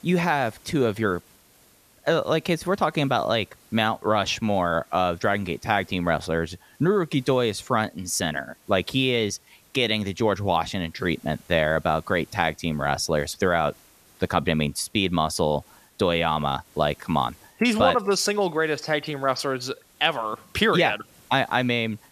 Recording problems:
hiss; faint; throughout; 30 dB below the speech

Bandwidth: 14.5 kHz